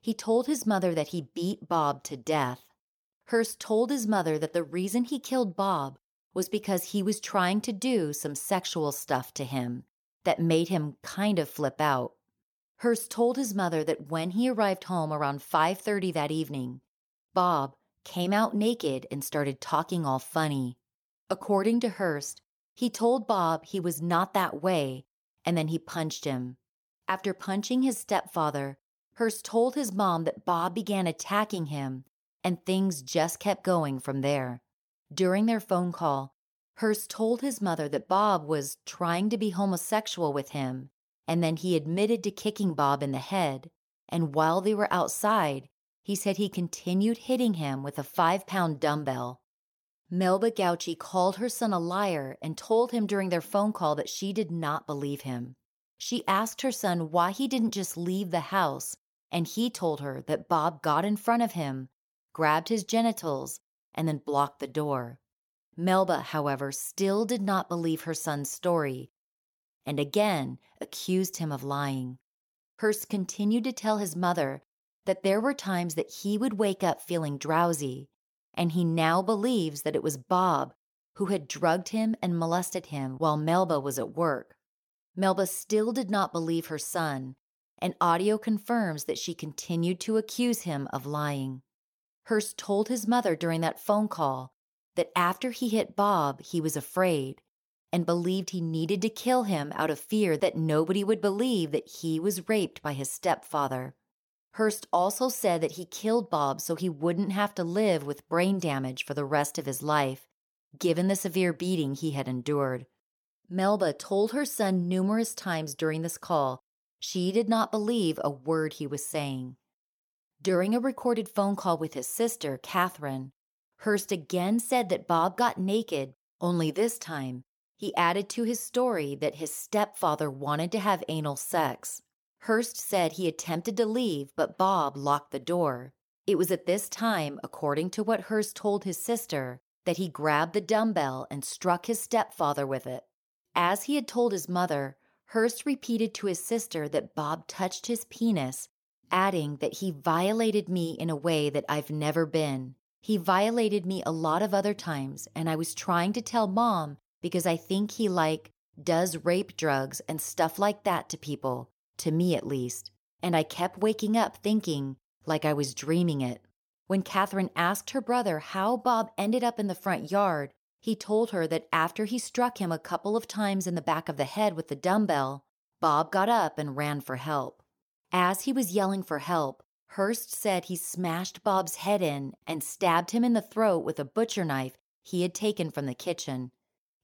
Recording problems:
none

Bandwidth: 18 kHz